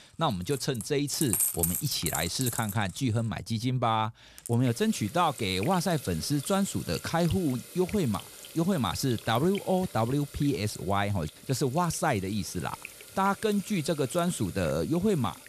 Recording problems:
household noises; loud; throughout; 8 dB below the speech

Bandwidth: 14.5 kHz